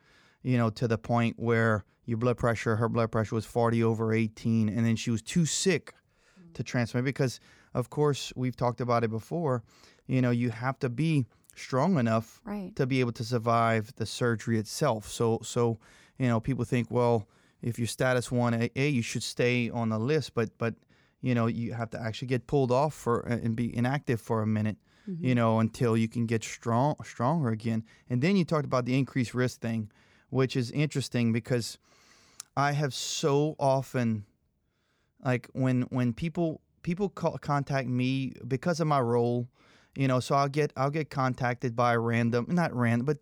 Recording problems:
none

